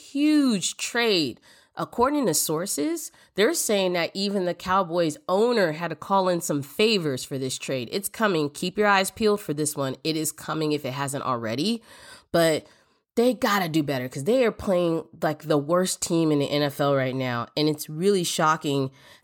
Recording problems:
none

